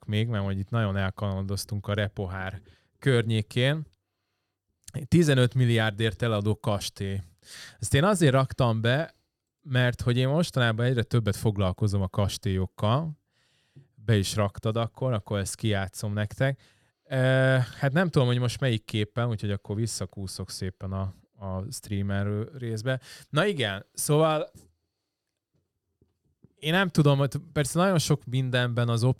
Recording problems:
none

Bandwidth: 17.5 kHz